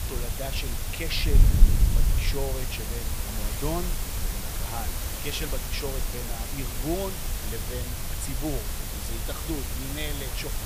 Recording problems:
hiss; very loud; throughout; 1 dB above the speech
wind noise on the microphone; occasional gusts; 15 dB below the speech

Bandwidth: 15 kHz